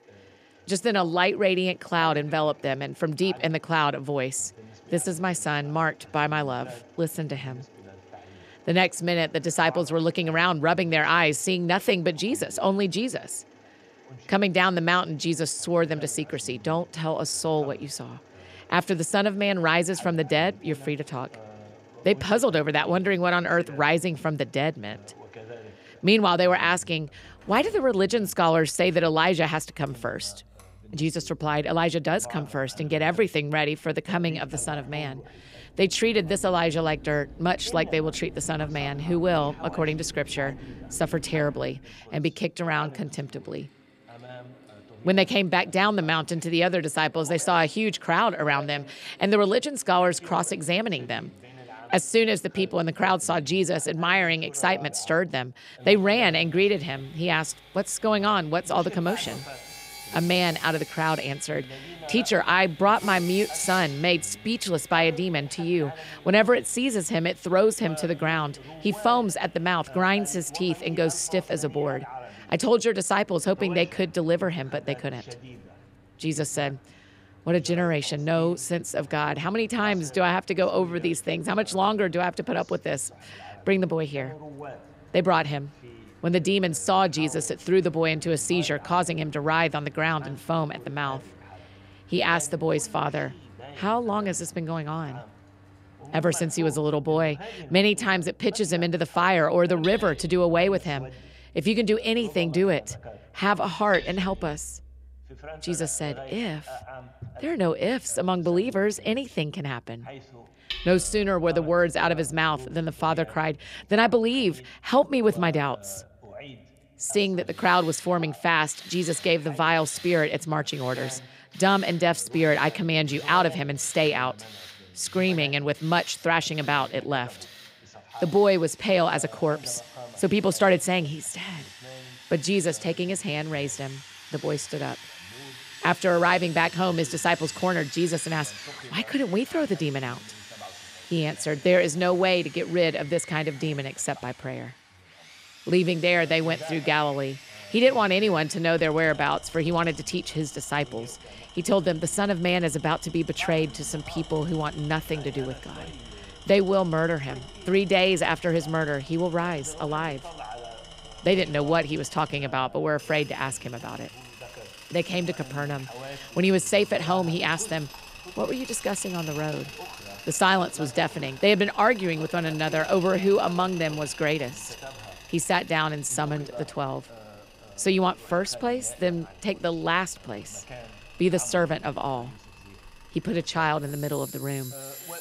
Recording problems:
machinery noise; noticeable; throughout; 20 dB below the speech
voice in the background; faint; throughout; 20 dB below the speech

